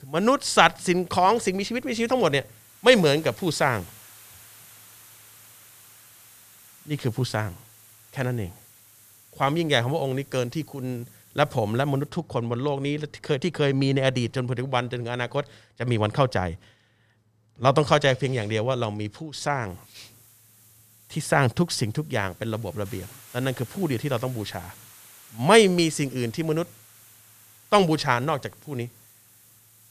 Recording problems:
hiss; faint; until 12 s and from 20 s on; 25 dB below the speech

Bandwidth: 14.5 kHz